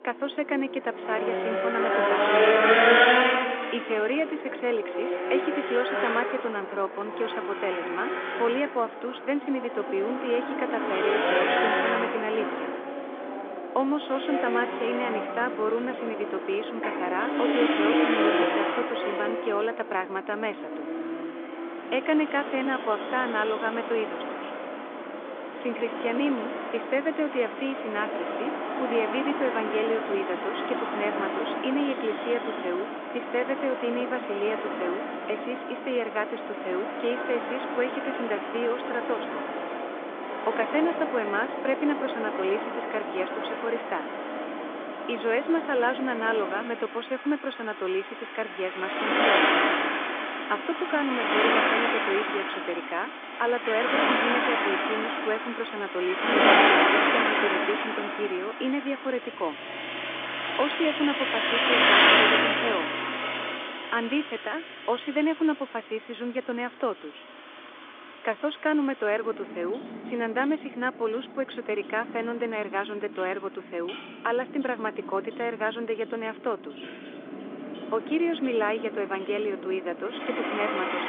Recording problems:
phone-call audio; nothing above 3.5 kHz
traffic noise; very loud; throughout; 3 dB above the speech

